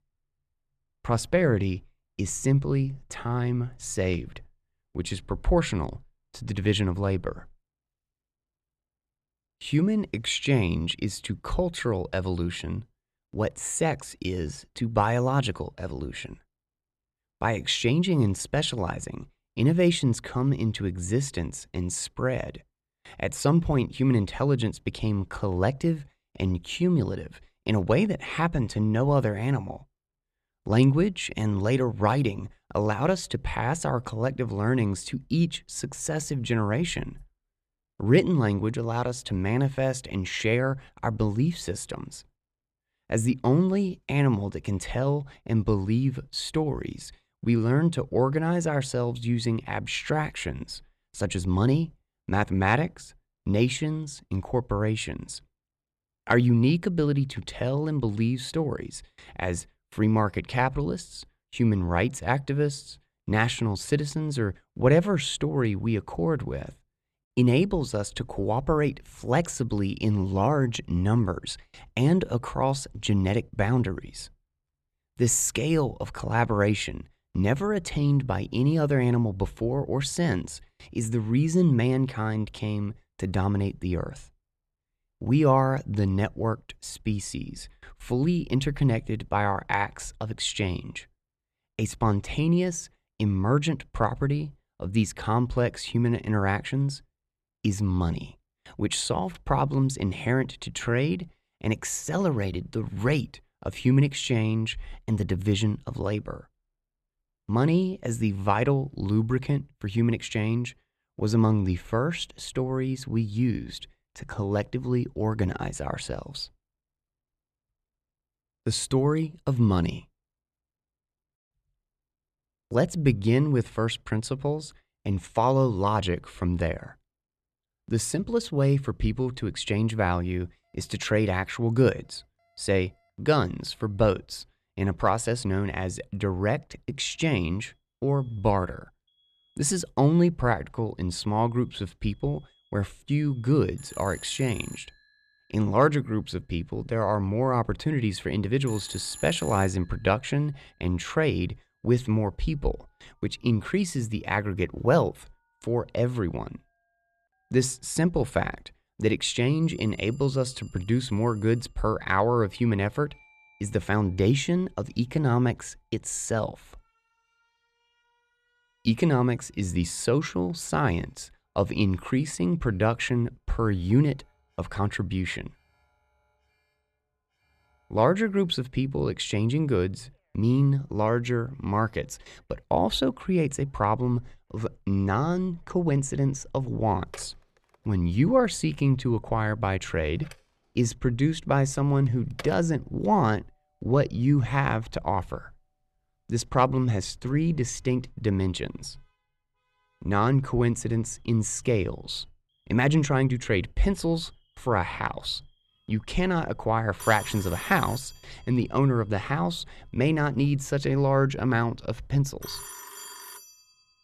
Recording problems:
alarms or sirens; noticeable; from 2:11 on; 15 dB below the speech

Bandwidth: 13.5 kHz